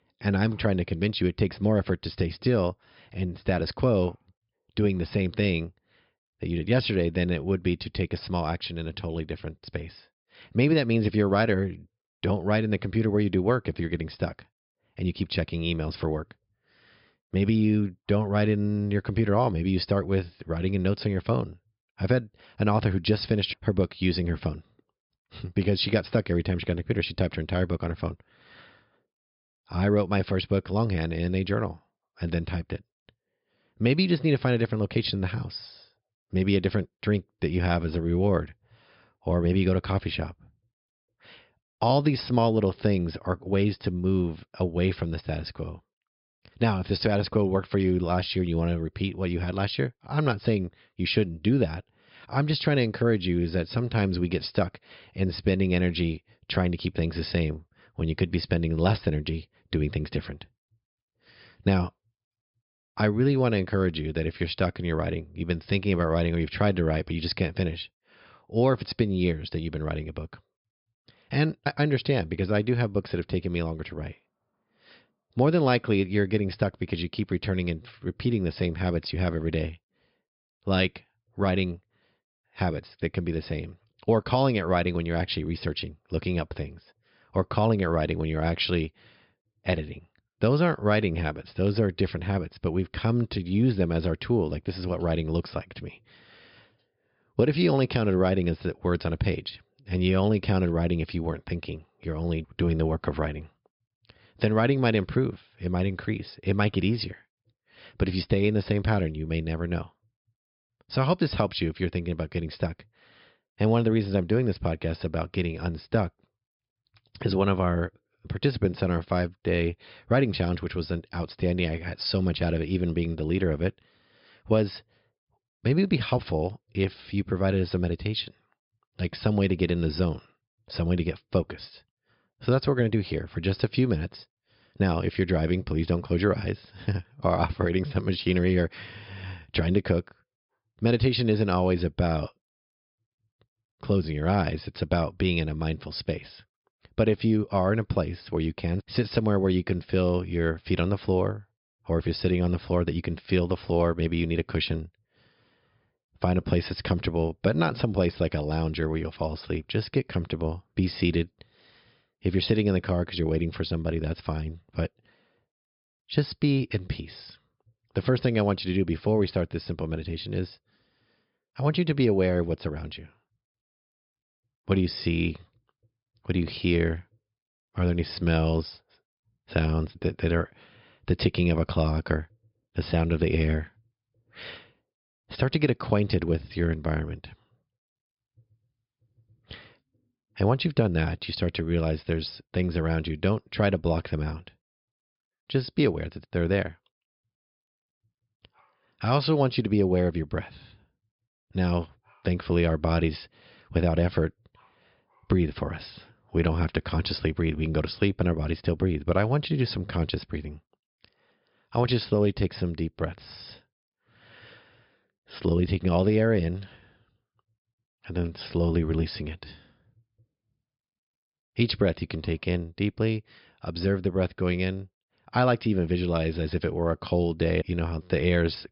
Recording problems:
high frequencies cut off; noticeable; nothing above 5.5 kHz

